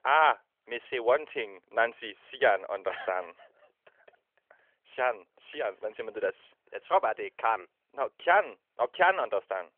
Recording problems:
phone-call audio; nothing above 3.5 kHz

